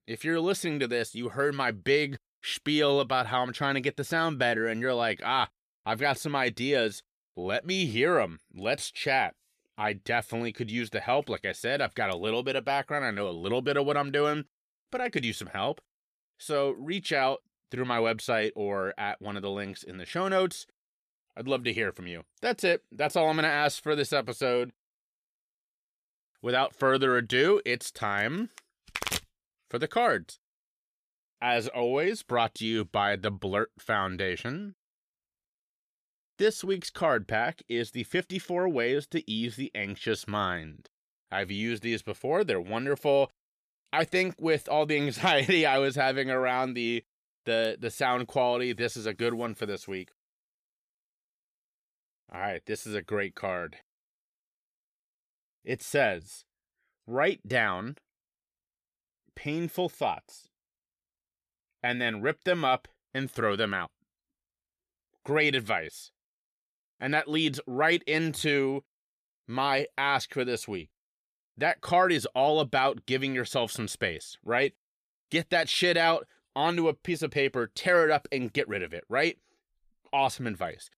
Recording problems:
none

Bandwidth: 14.5 kHz